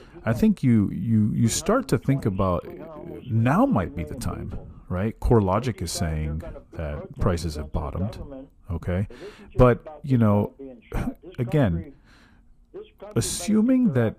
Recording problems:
voice in the background; noticeable; throughout; 20 dB below the speech

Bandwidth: 14.5 kHz